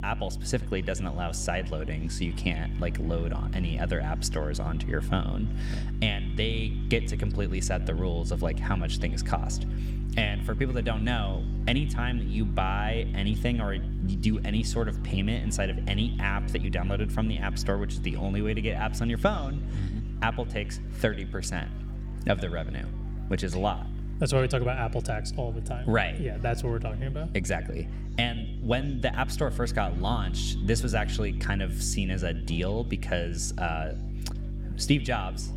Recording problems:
echo of what is said; faint; throughout; 90 ms later, 20 dB below the speech
electrical hum; noticeable; throughout; 50 Hz, 15 dB below the speech
chatter from many people; faint; throughout; 25 dB below the speech

